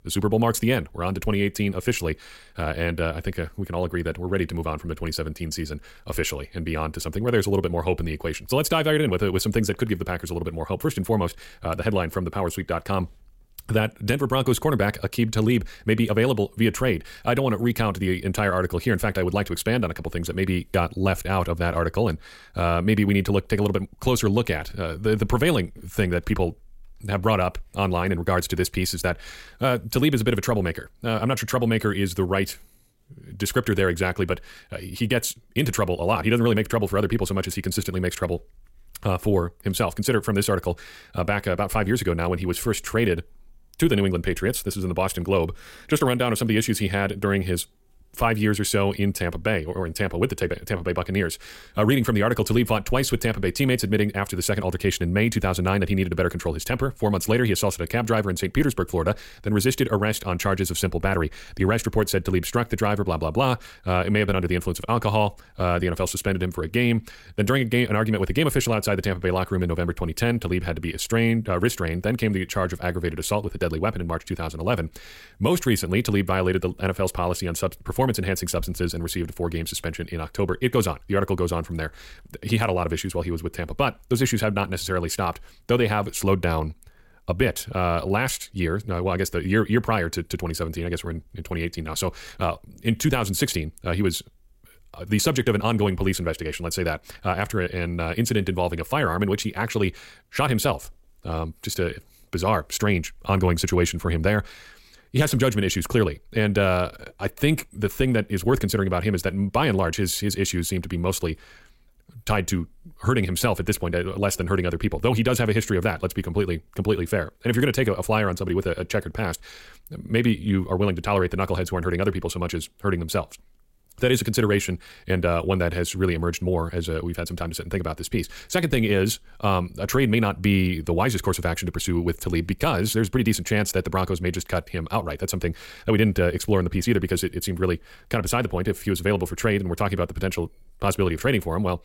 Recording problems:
wrong speed, natural pitch; too fast; 1.5 times normal speed

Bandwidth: 16 kHz